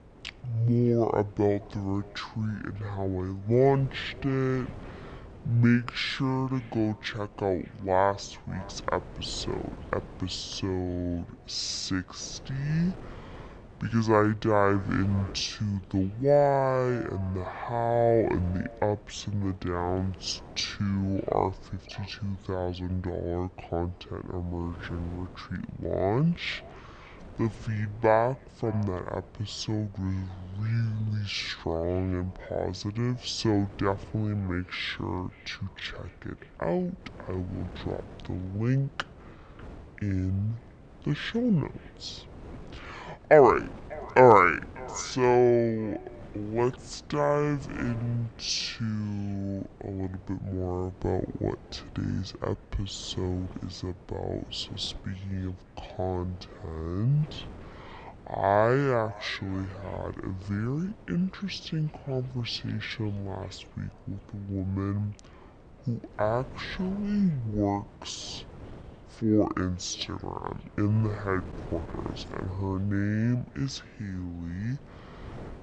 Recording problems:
wrong speed and pitch; too slow and too low; 0.5 times normal speed
echo of what is said; faint; throughout; 590 ms later, 25 dB below the speech
wind noise on the microphone; occasional gusts; 20 dB below the speech

